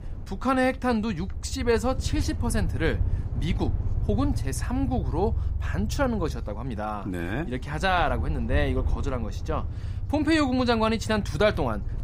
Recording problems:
low rumble; noticeable; throughout; 20 dB below the speech

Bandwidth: 15.5 kHz